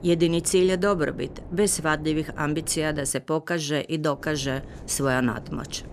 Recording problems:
wind noise on the microphone; occasional gusts; until 3 s and from 4 s on; 20 dB below the speech

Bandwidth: 14 kHz